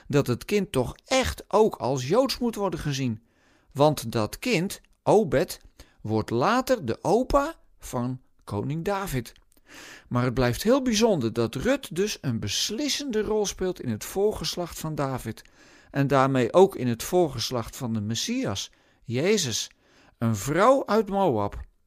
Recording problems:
none

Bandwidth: 15 kHz